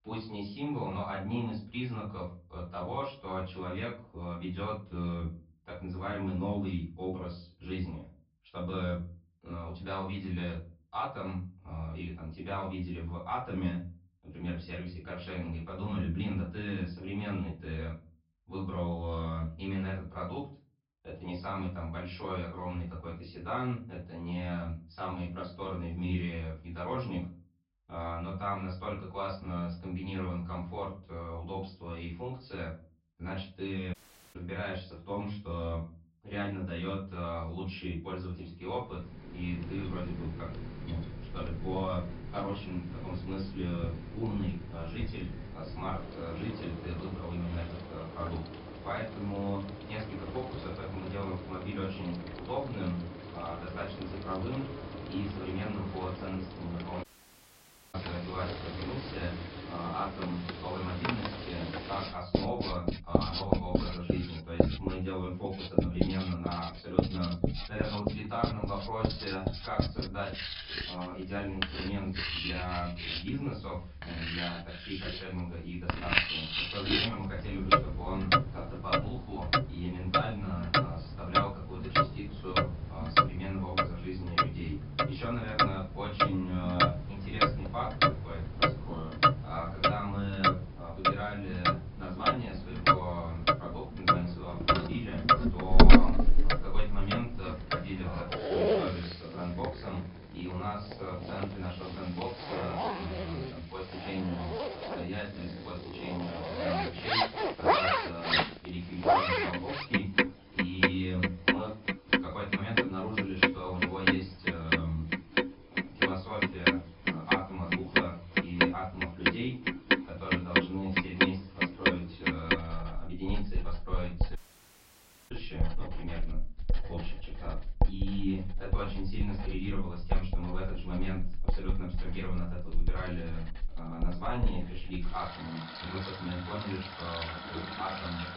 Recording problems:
off-mic speech; far
high frequencies cut off; noticeable; nothing above 5.5 kHz
room echo; slight; dies away in 0.3 s
household noises; very loud; from 39 s on; 6 dB above the speech
audio cutting out; at 34 s, at 57 s for 1 s and at 2:04 for 1 s

